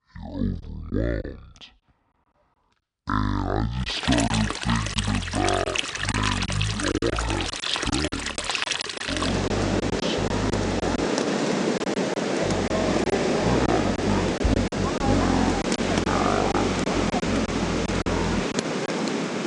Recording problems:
wrong speed and pitch; too slow and too low; 0.5 times normal speed
rain or running water; very loud; from 4 s on; 3 dB above the speech
choppy; very; 6% of the speech affected

